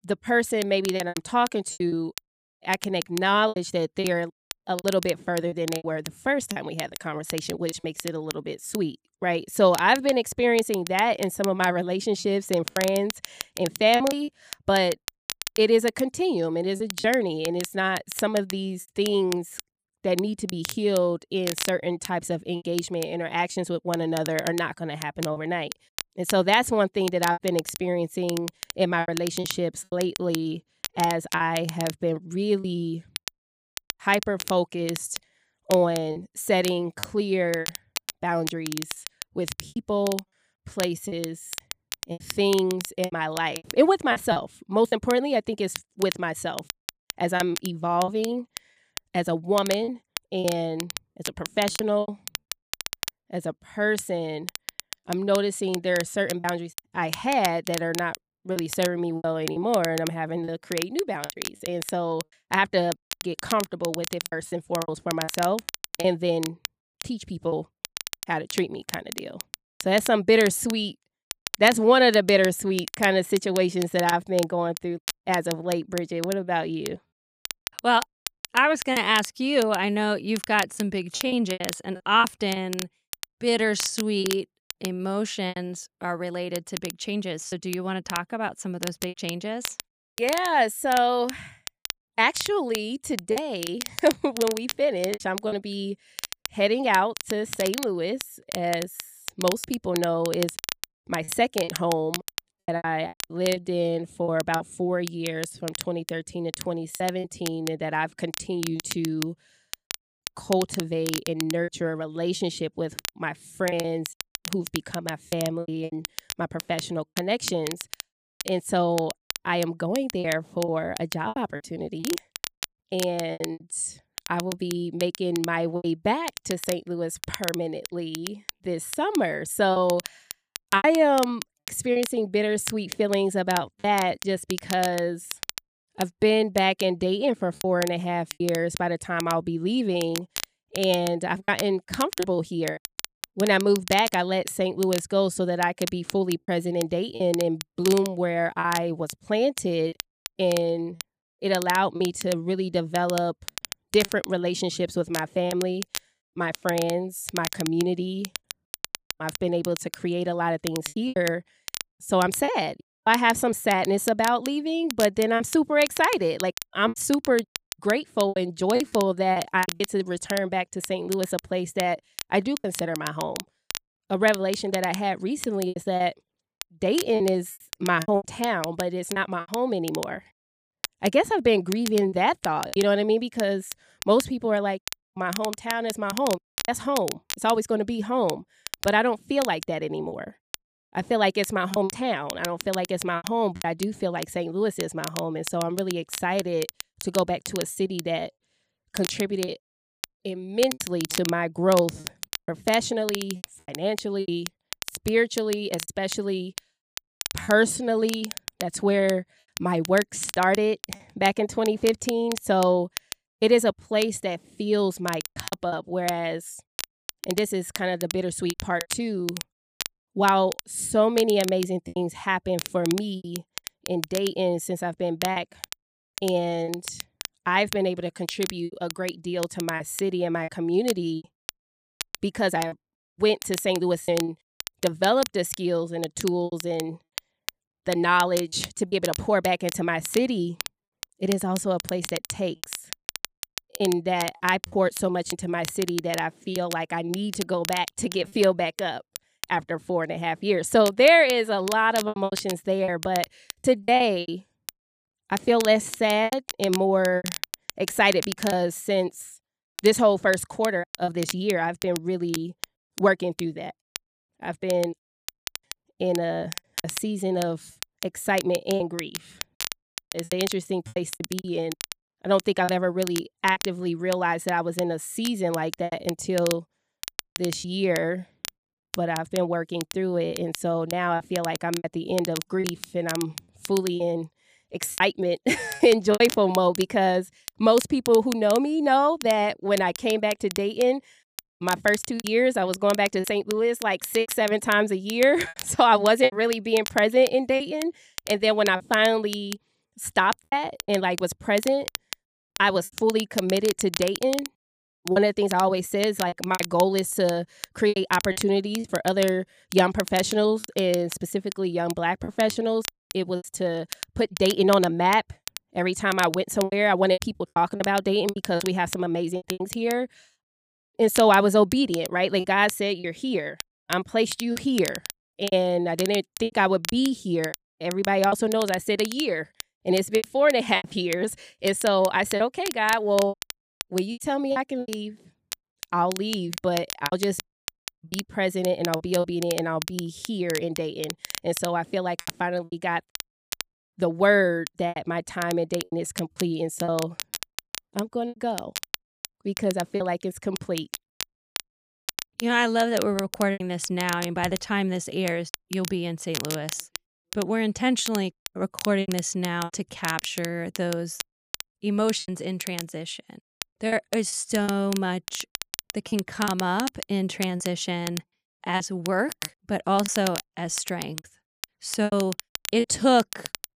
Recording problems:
crackle, like an old record; noticeable; 10 dB below the speech
choppy; very; 6% of the speech affected

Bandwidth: 15 kHz